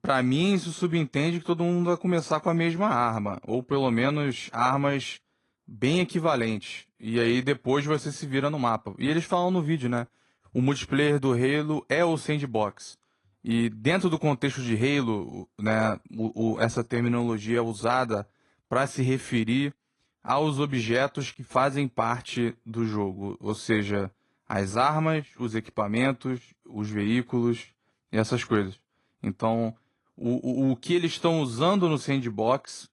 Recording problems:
garbled, watery; slightly

